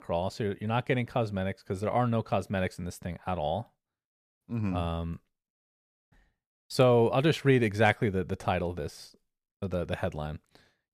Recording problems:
none

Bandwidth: 14.5 kHz